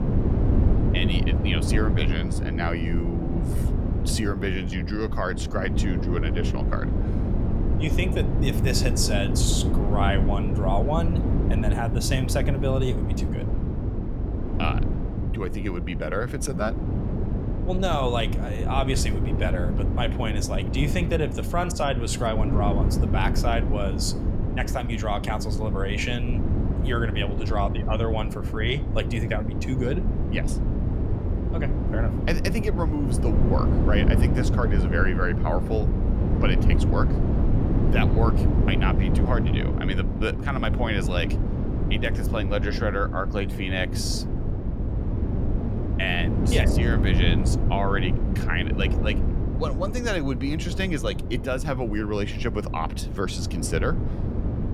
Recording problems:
wind noise on the microphone; heavy; 6 dB below the speech

